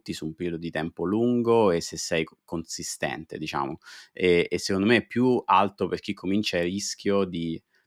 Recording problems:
none

